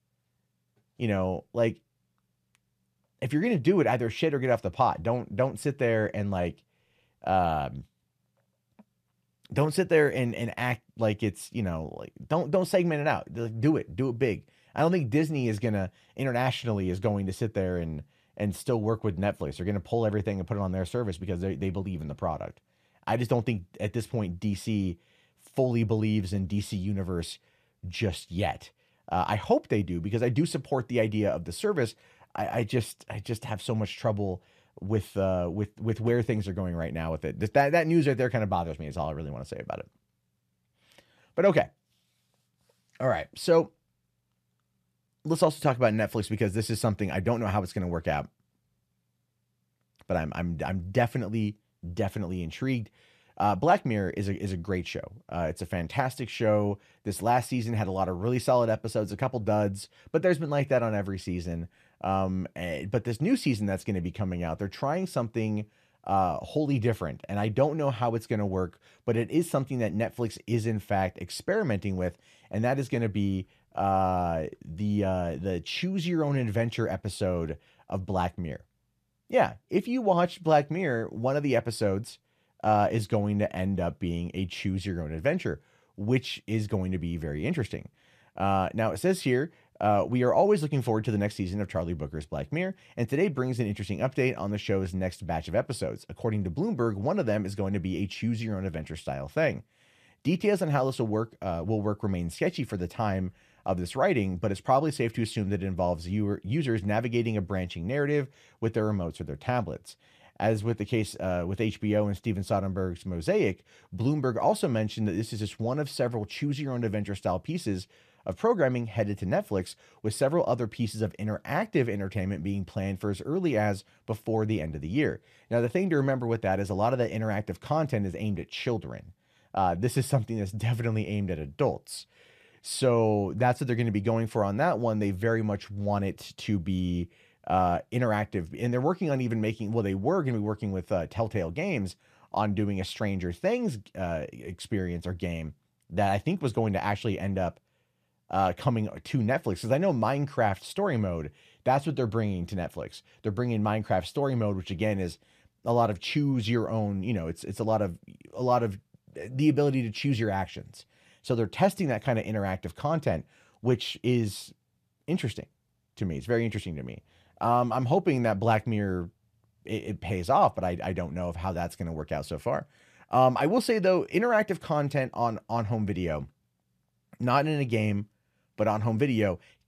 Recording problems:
none

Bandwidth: 14.5 kHz